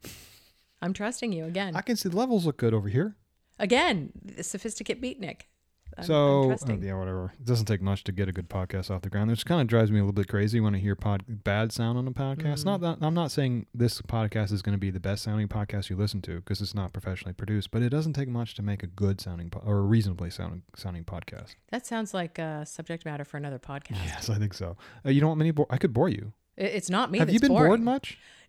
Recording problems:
none

